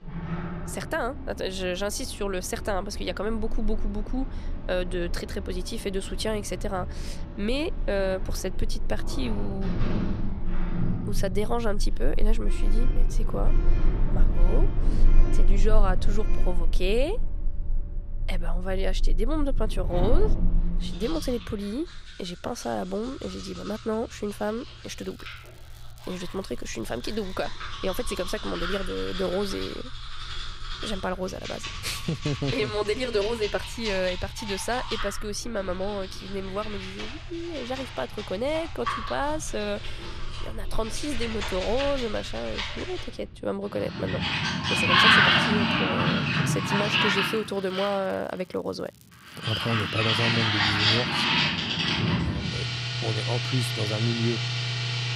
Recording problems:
household noises; very loud; throughout; 3 dB above the speech
crackling; faint; from 25 to 27 s and from 47 to 50 s; 25 dB below the speech

